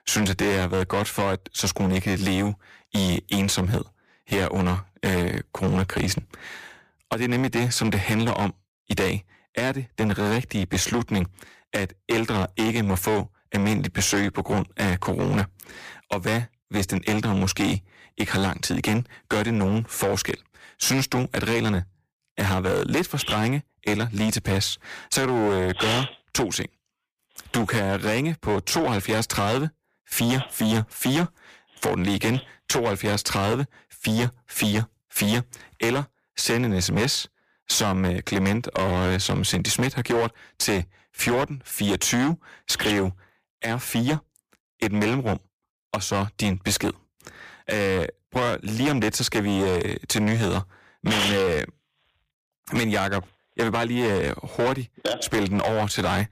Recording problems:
distortion; heavy; 16% of the sound clipped

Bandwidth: 15 kHz